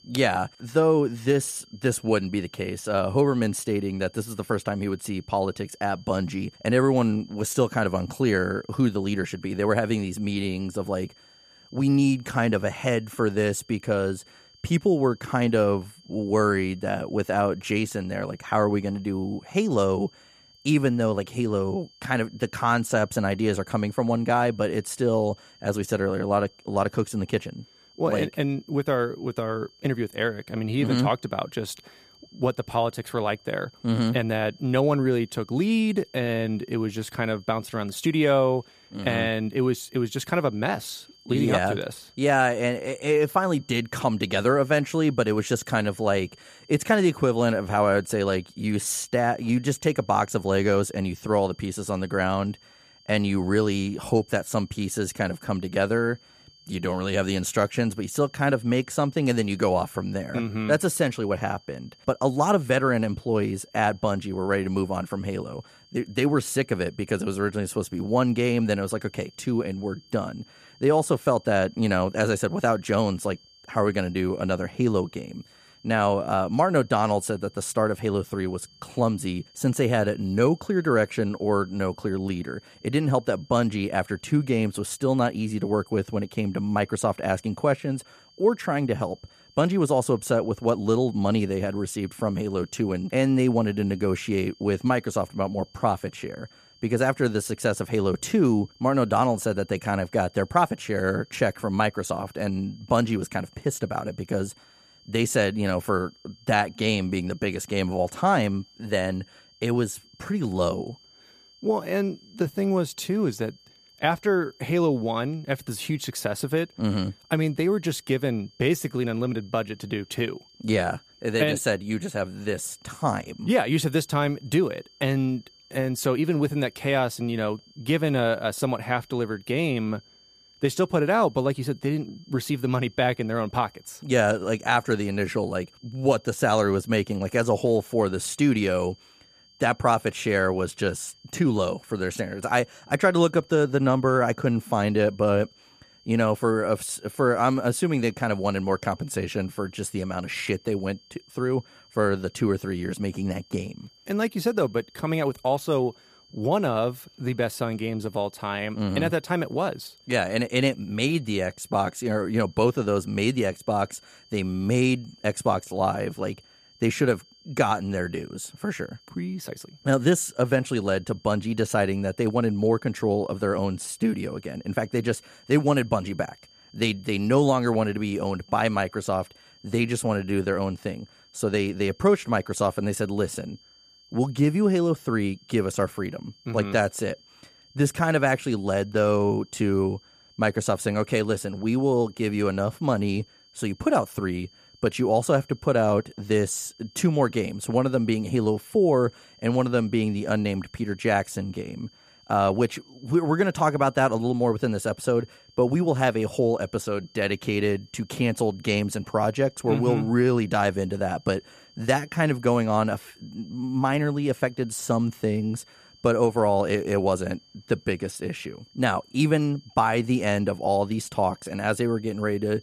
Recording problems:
high-pitched whine; faint; throughout; 4.5 kHz, 30 dB below the speech

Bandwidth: 14.5 kHz